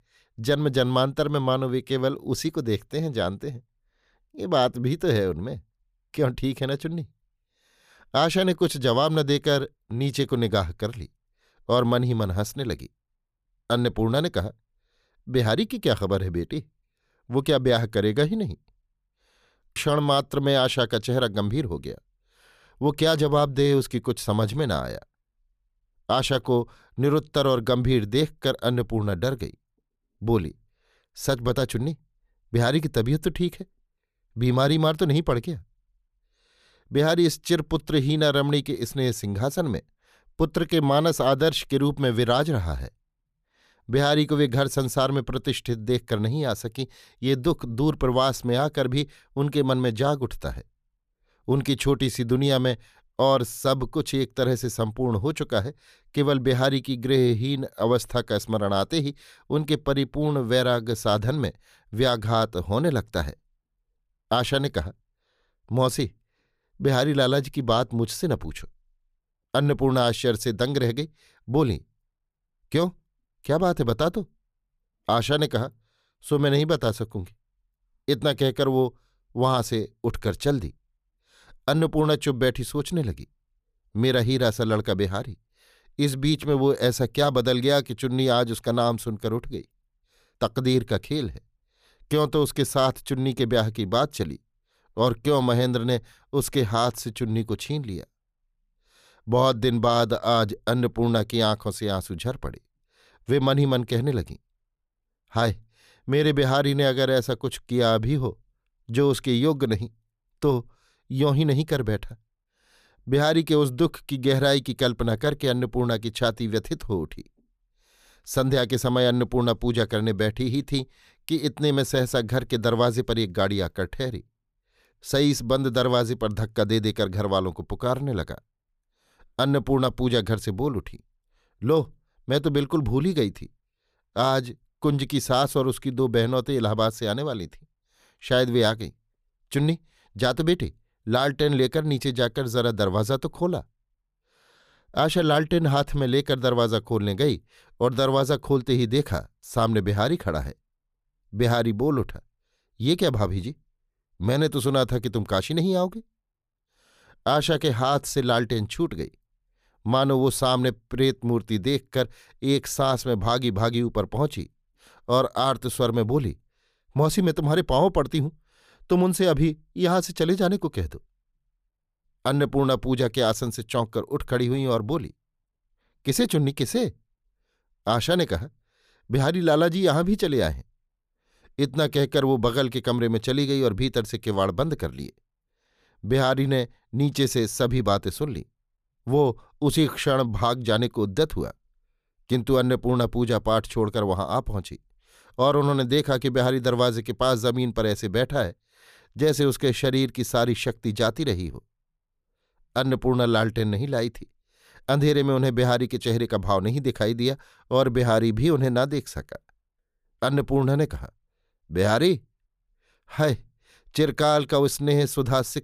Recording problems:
none

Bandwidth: 14.5 kHz